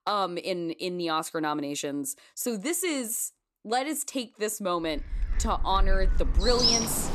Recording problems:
animal sounds; very loud; from 5.5 s on; 3 dB above the speech

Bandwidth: 14 kHz